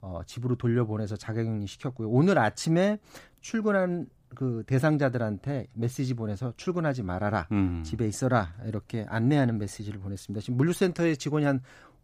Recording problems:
none

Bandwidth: 15 kHz